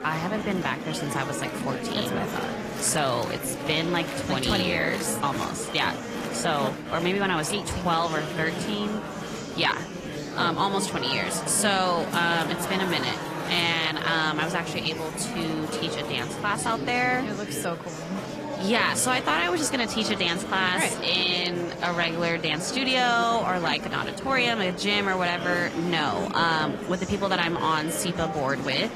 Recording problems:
garbled, watery; slightly
murmuring crowd; loud; throughout; 7 dB below the speech

